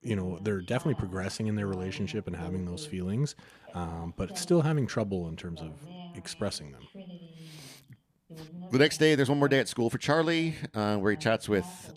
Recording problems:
voice in the background; noticeable; throughout; 20 dB below the speech

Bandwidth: 14.5 kHz